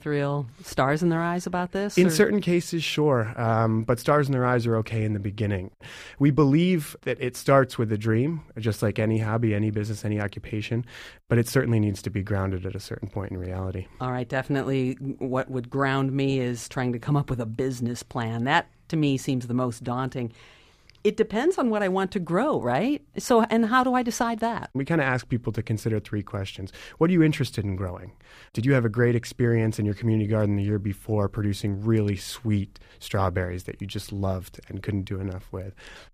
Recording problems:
none

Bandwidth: 15 kHz